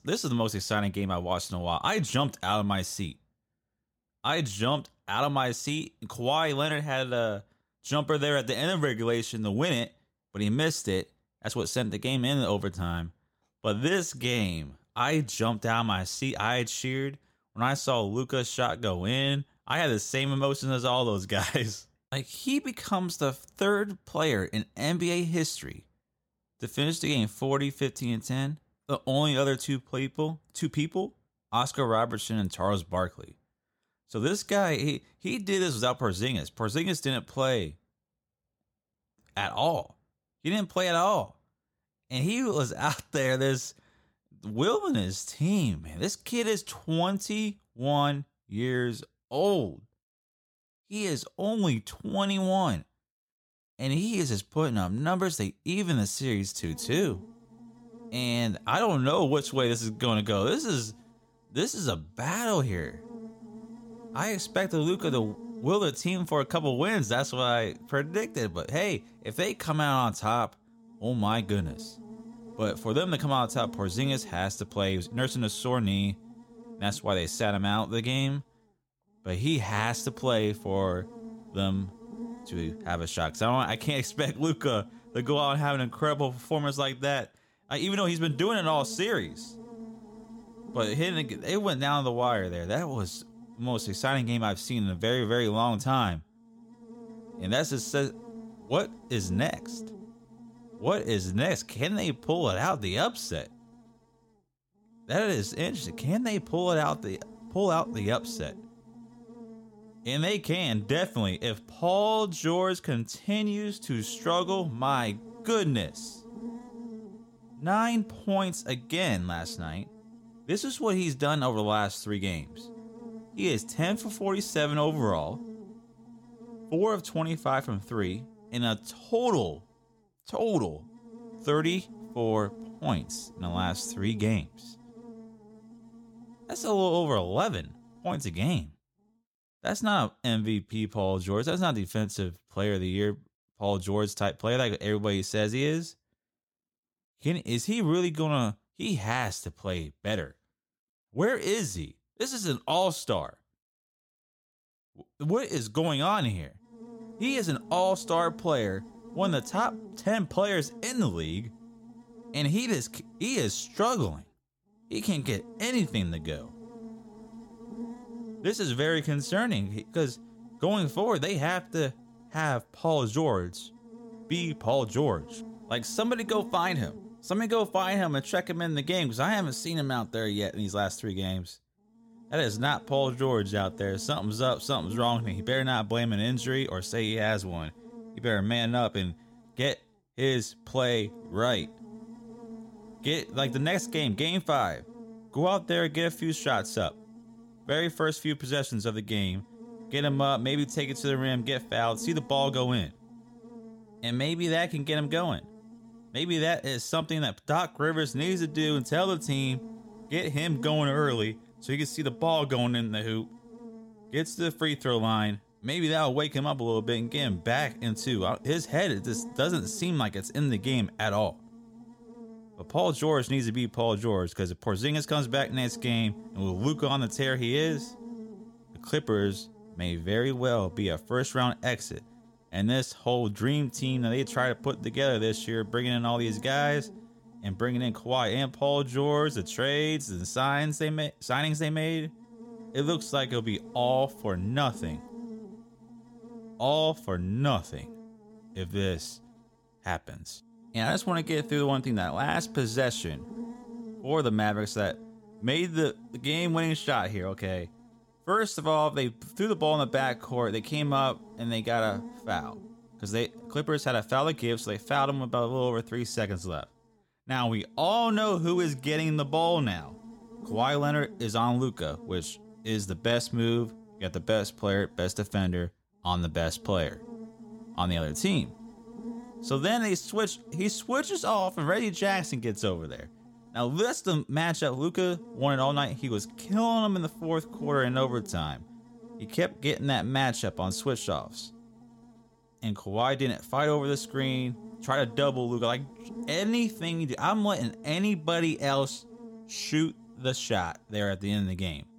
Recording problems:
electrical hum; faint; from 57 s to 2:19 and from 2:37 on; 60 Hz, 20 dB below the speech

